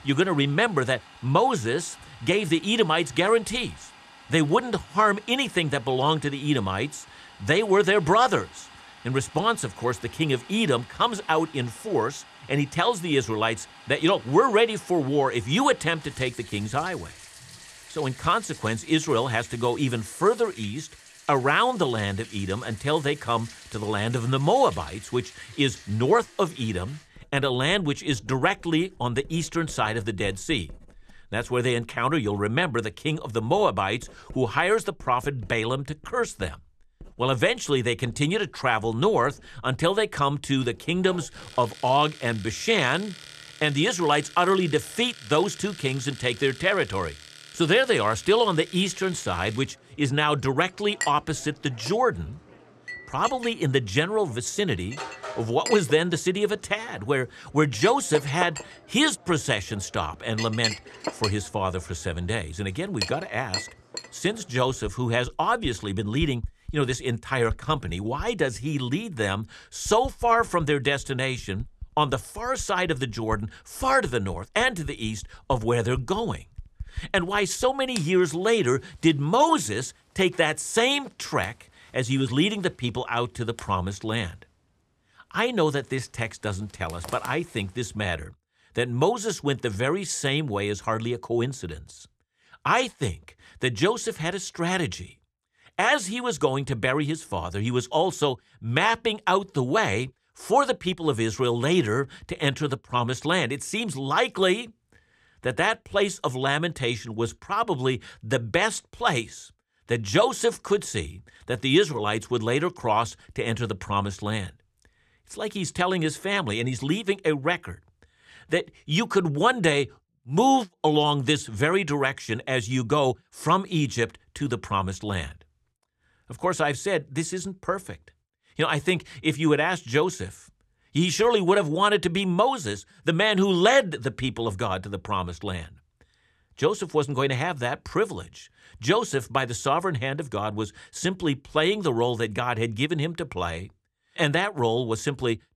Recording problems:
household noises; noticeable; until 1:28; 15 dB below the speech

